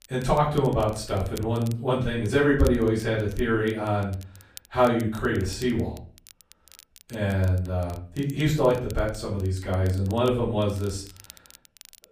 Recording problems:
off-mic speech; far
room echo; slight; dies away in 0.4 s
crackle, like an old record; faint; 25 dB below the speech

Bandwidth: 15 kHz